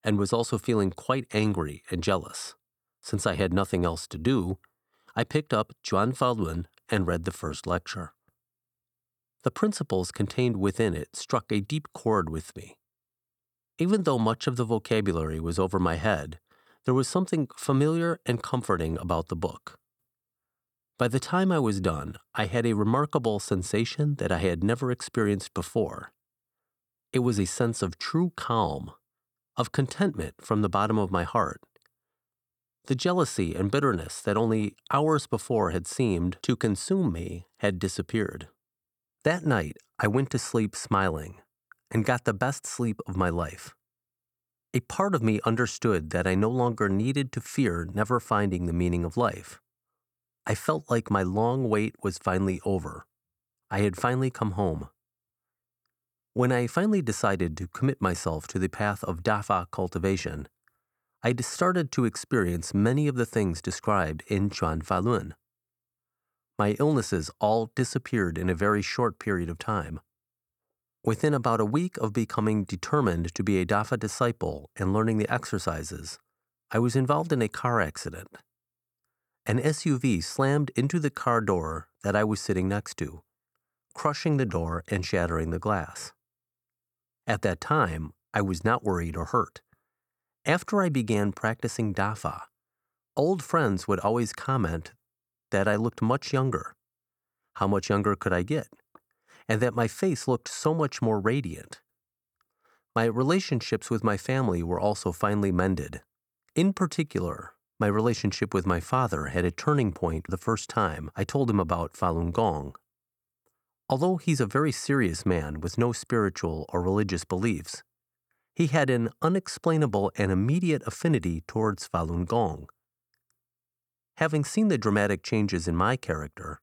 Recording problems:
none

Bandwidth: 19 kHz